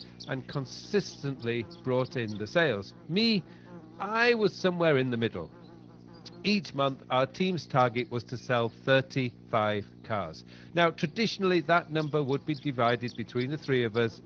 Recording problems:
garbled, watery; slightly
electrical hum; faint; throughout; 60 Hz, 25 dB below the speech

